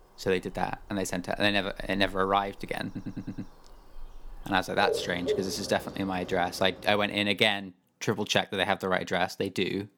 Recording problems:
animal sounds; loud; until 7 s; 9 dB below the speech
audio stuttering; at 3 s

